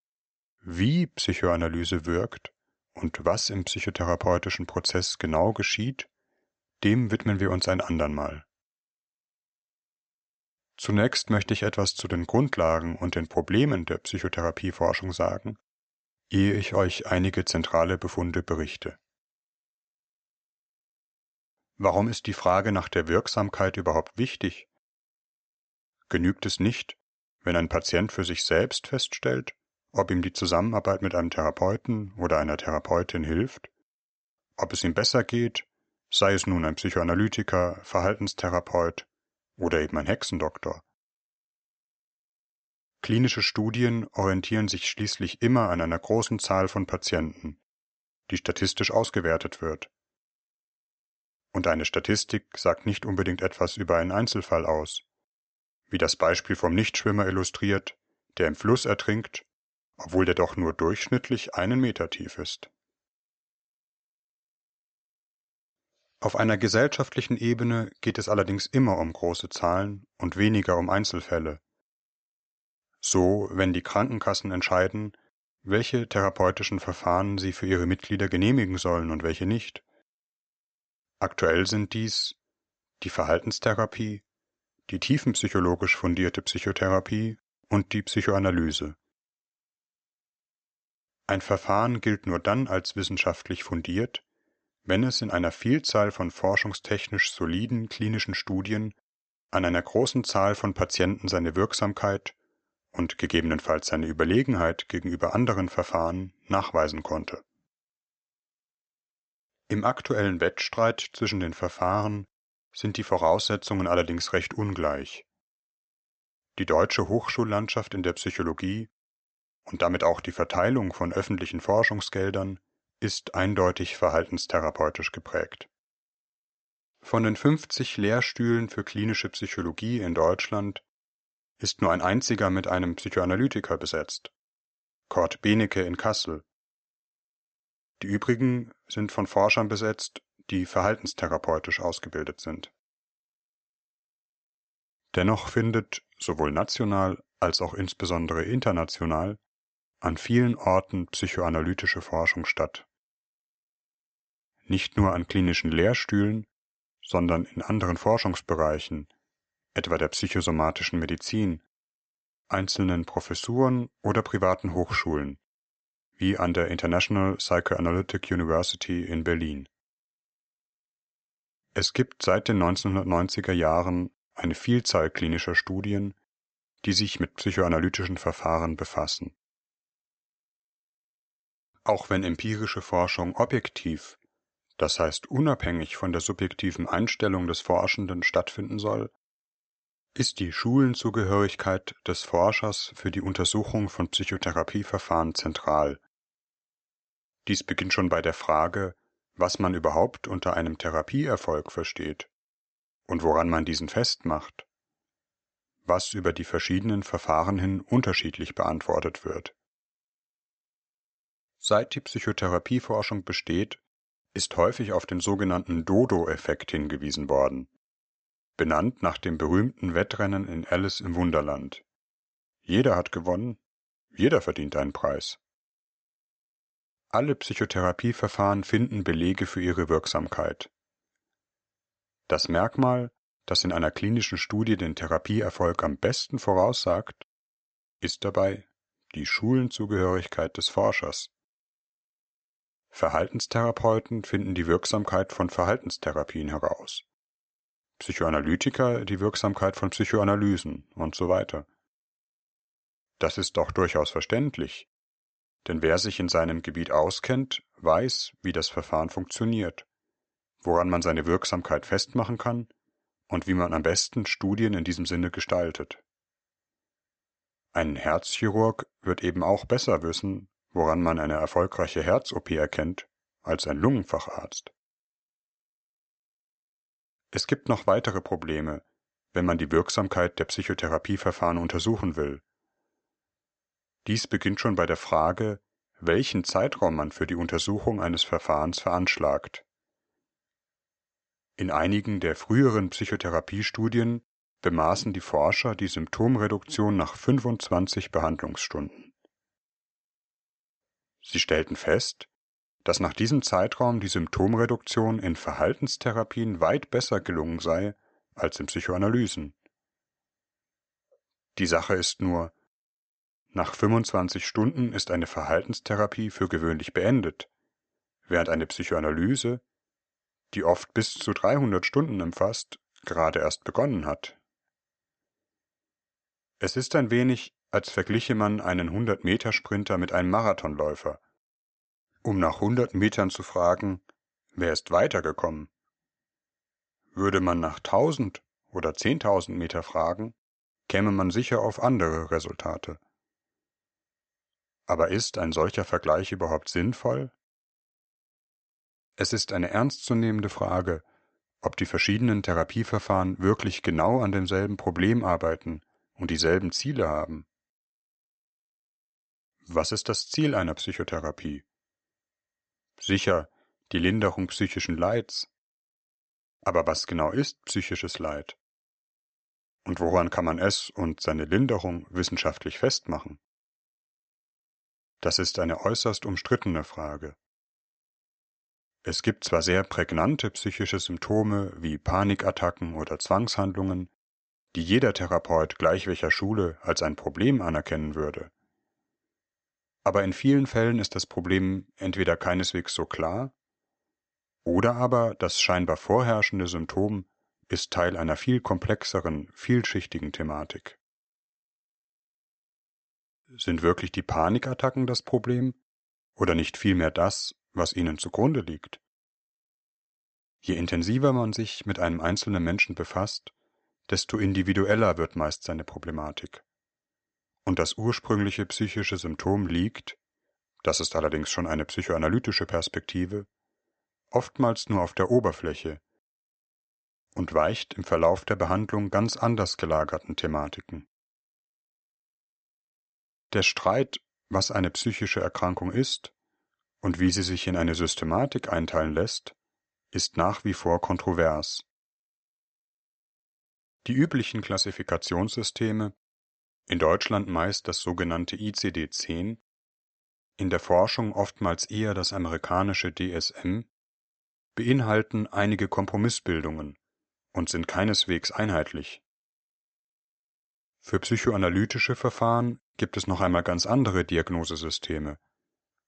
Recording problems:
high frequencies cut off; noticeable; nothing above 8 kHz

